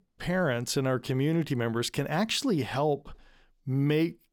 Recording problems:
none

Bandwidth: 18 kHz